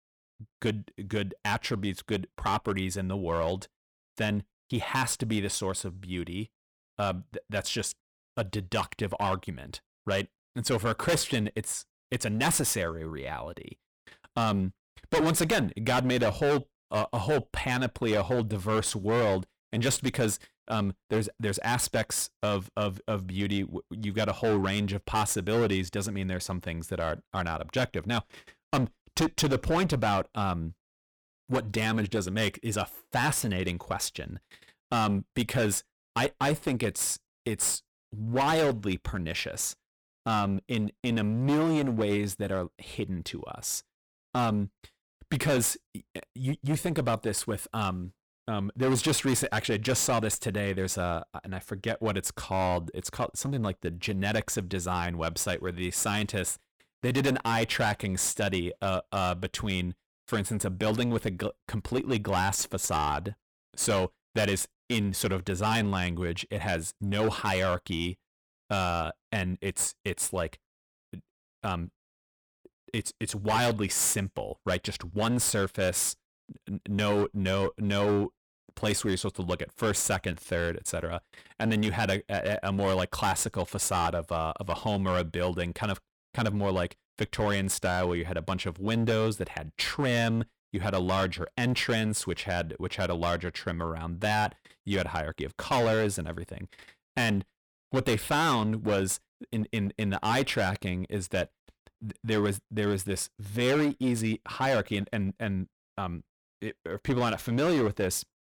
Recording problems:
distortion; heavy; 10% of the sound clipped

